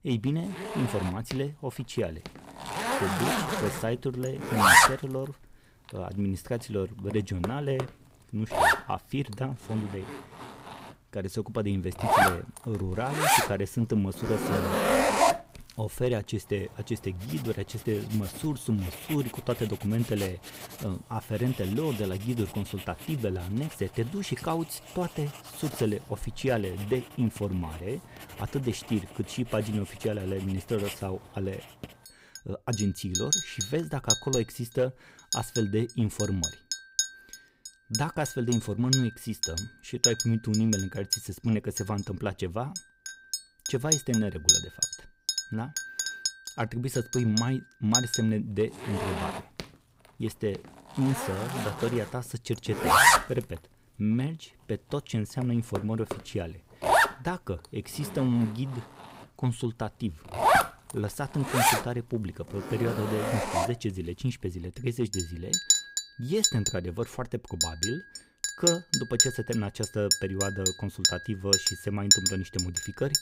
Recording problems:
household noises; very loud; throughout; 5 dB above the speech

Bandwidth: 15.5 kHz